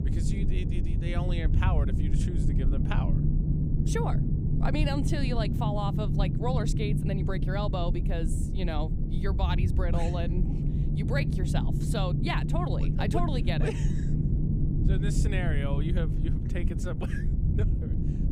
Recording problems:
low rumble; loud; throughout; 4 dB below the speech

